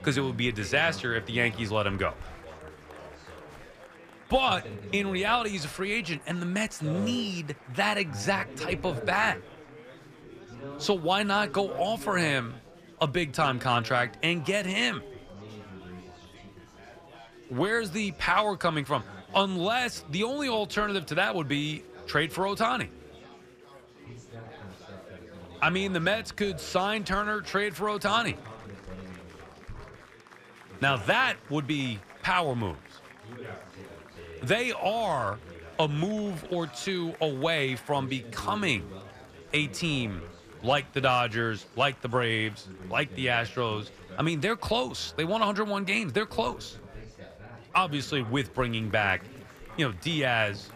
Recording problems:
chatter from many people; noticeable; throughout; 15 dB below the speech

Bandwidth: 14.5 kHz